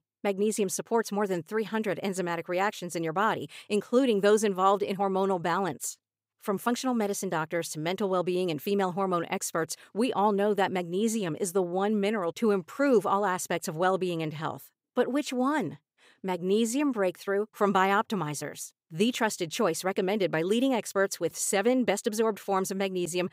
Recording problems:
none

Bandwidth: 15.5 kHz